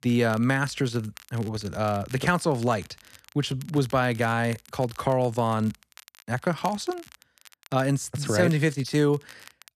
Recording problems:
crackle, like an old record; faint; 25 dB below the speech

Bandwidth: 14 kHz